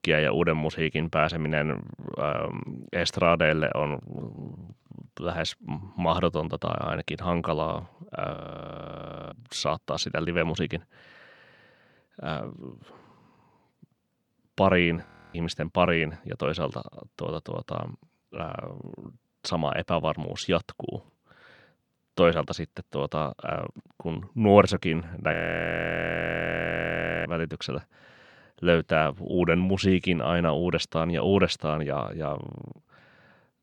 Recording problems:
audio freezing; at 8.5 s for 1 s, at 15 s and at 25 s for 2 s

